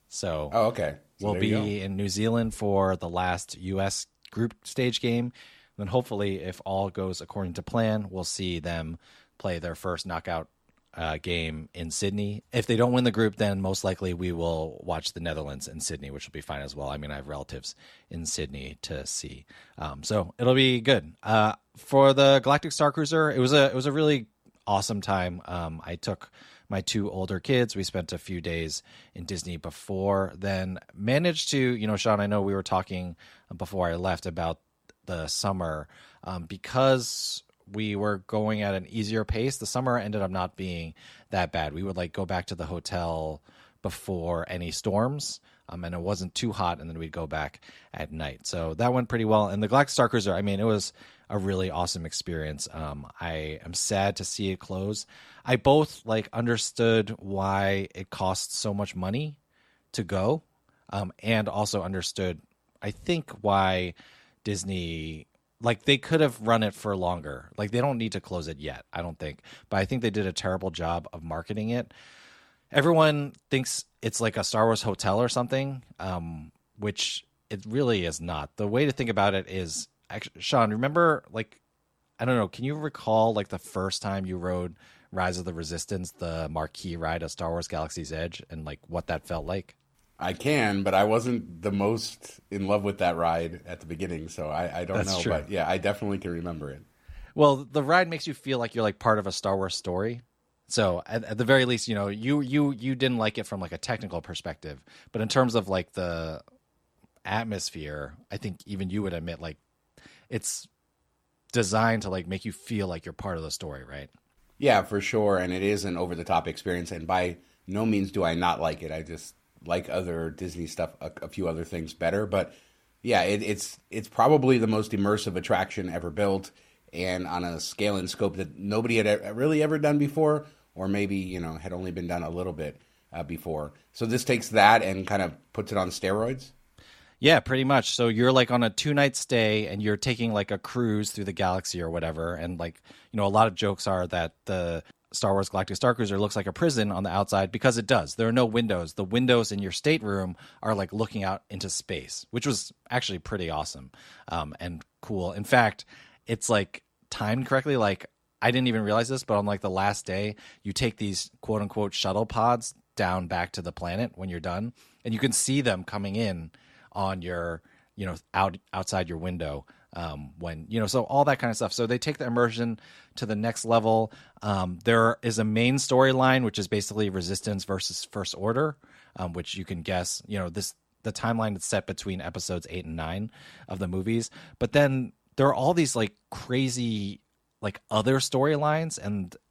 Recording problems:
none

